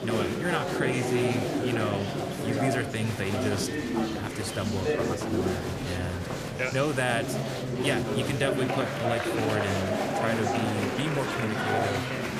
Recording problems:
murmuring crowd; very loud; throughout; 2 dB above the speech

